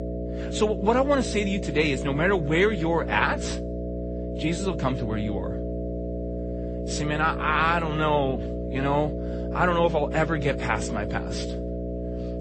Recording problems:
garbled, watery; slightly; nothing above 8 kHz
electrical hum; noticeable; throughout; 60 Hz, 10 dB below the speech

